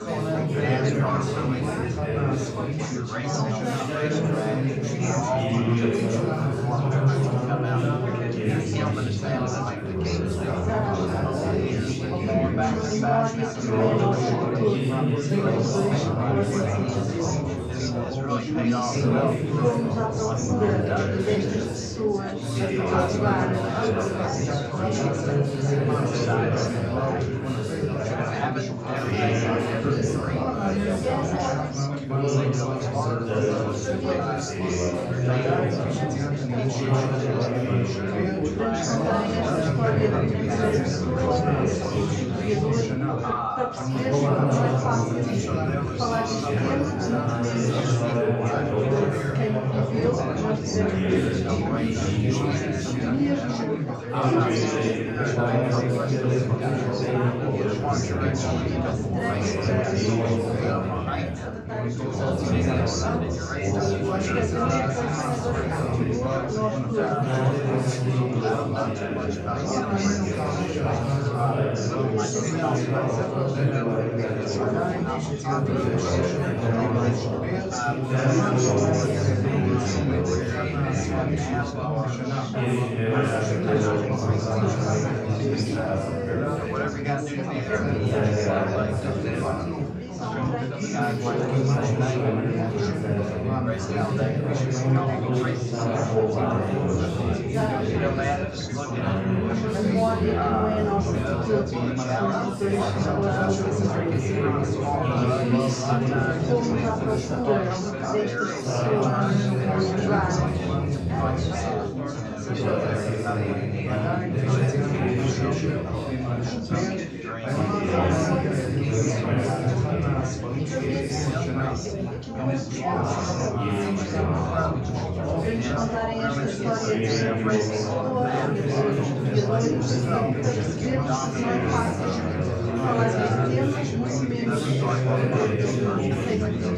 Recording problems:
room echo; strong; dies away in 2.4 s
off-mic speech; far
chatter from many people; very loud; throughout; 1 dB above the speech

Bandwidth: 14.5 kHz